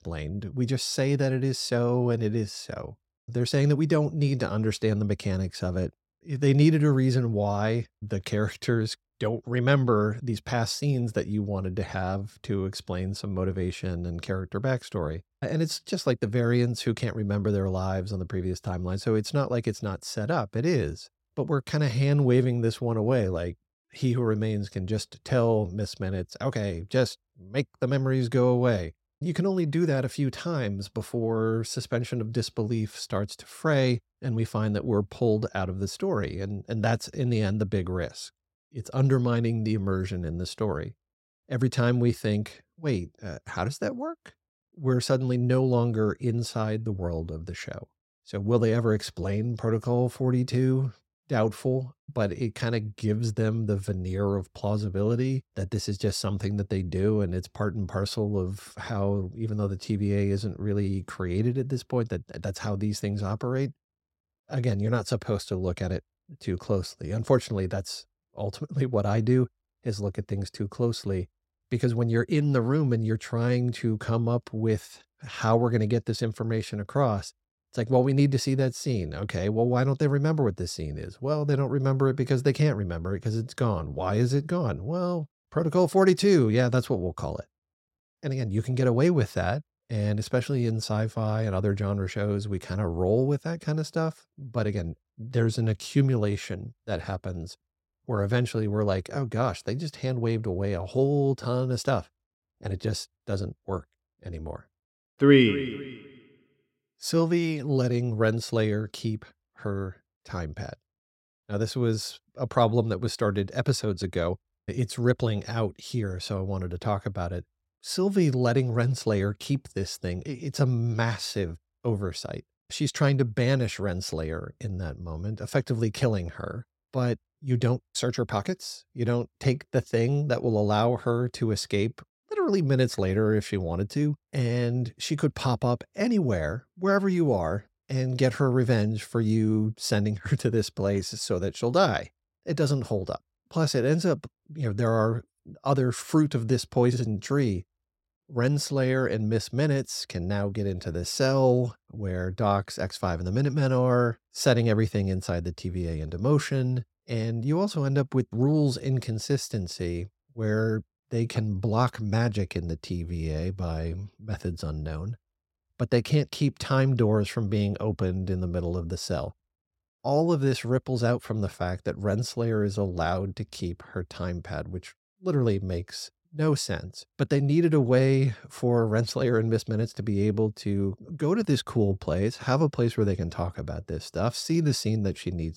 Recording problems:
none

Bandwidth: 16 kHz